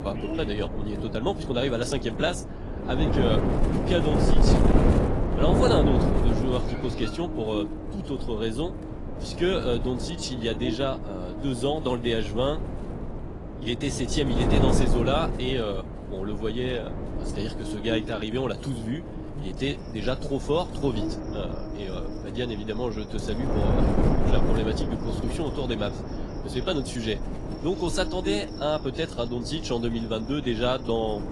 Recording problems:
garbled, watery; slightly; nothing above 10.5 kHz
wind noise on the microphone; heavy; 4 dB below the speech
electrical hum; noticeable; throughout; 60 Hz, 15 dB below the speech
animal sounds; faint; throughout; 25 dB below the speech

